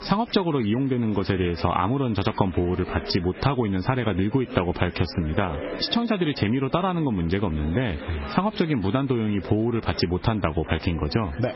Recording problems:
garbled, watery; badly; nothing above 5.5 kHz
squashed, flat; somewhat, background pumping
chatter from many people; noticeable; throughout; 15 dB below the speech

